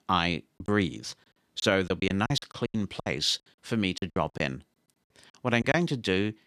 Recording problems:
choppy; very; 12% of the speech affected

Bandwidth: 14.5 kHz